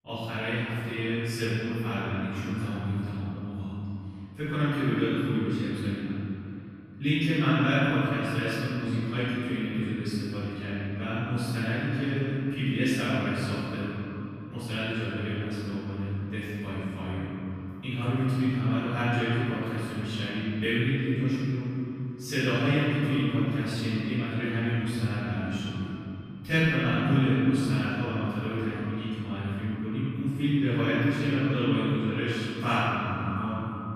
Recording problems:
room echo; strong; dies away in 2.8 s
off-mic speech; far
echo of what is said; noticeable; throughout; 260 ms later, 15 dB below the speech

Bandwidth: 15 kHz